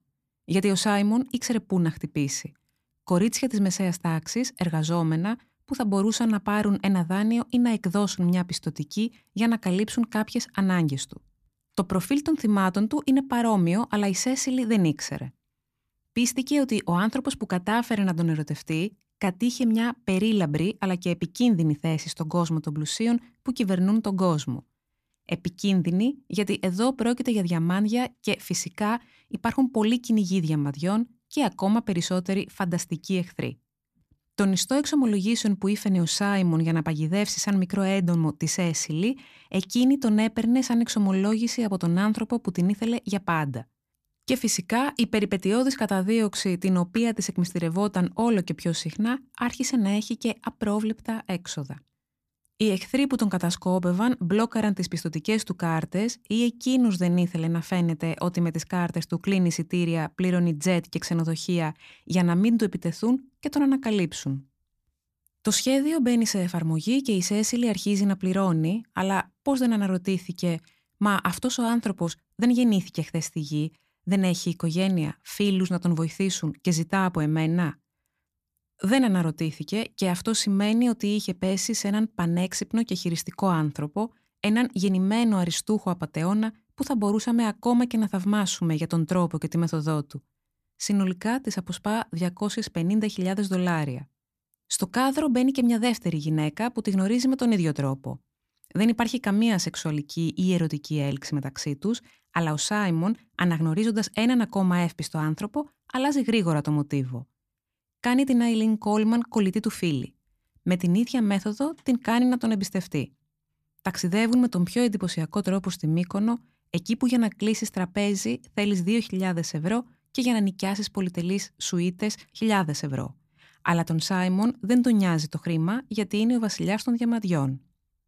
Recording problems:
none

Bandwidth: 14.5 kHz